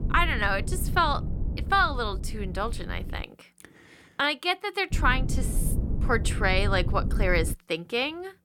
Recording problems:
low rumble; noticeable; until 3 s and from 5 to 7.5 s; 15 dB below the speech

